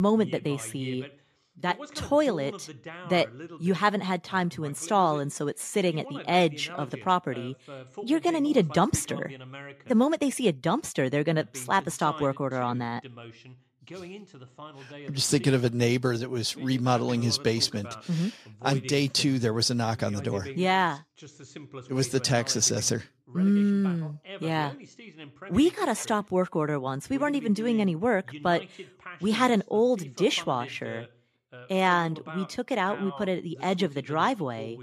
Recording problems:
voice in the background; noticeable; throughout; 15 dB below the speech
abrupt cut into speech; at the start

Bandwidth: 14.5 kHz